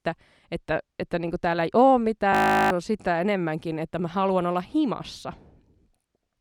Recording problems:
audio freezing; at 2.5 s

